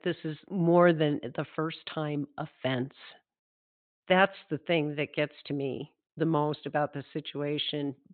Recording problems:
high frequencies cut off; severe; nothing above 4 kHz

